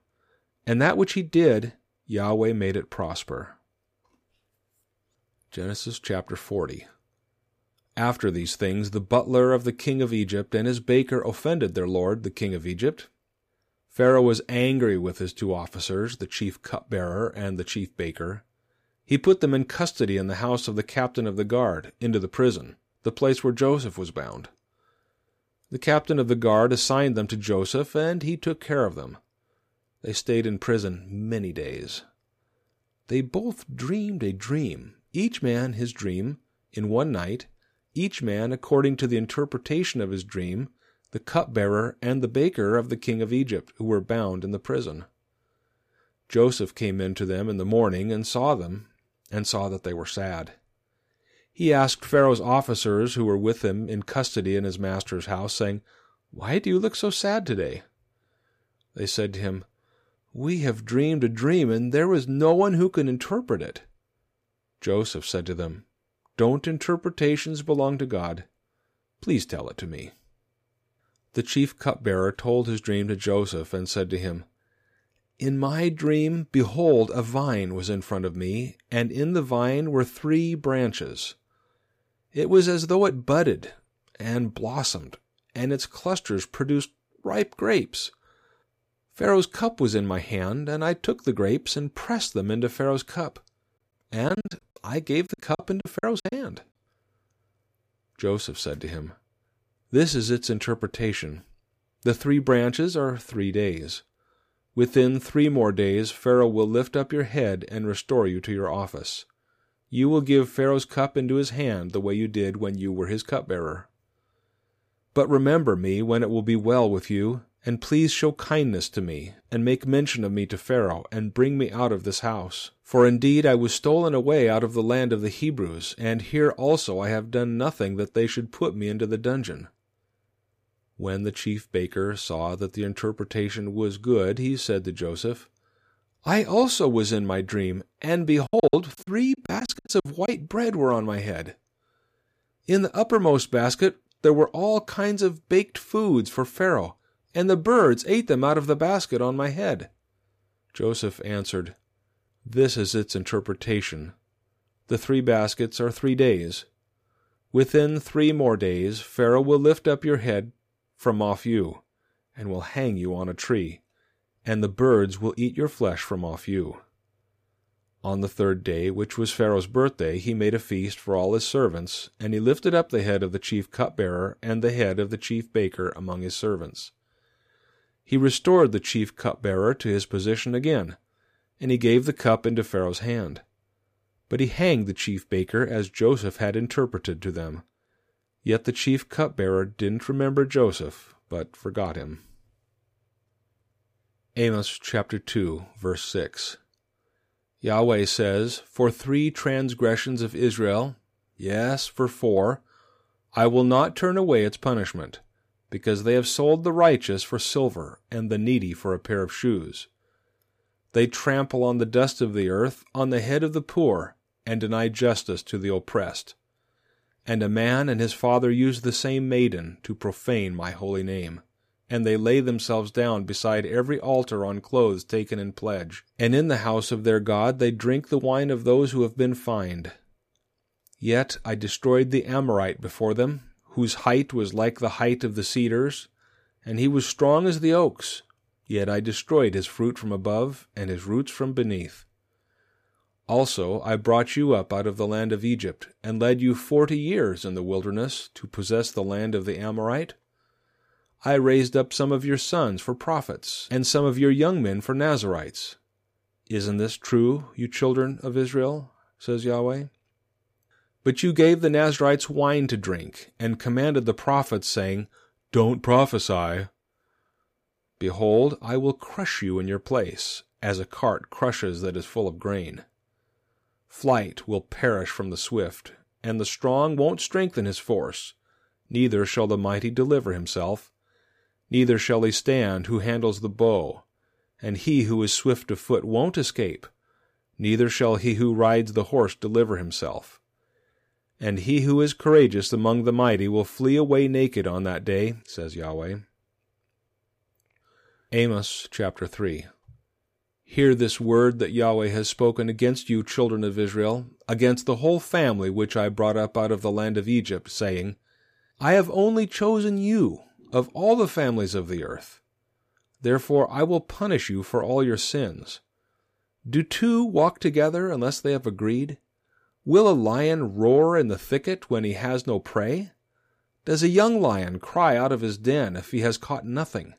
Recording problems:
choppy; very; from 1:34 to 1:36 and from 2:18 to 2:20; 20% of the speech affected

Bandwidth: 15 kHz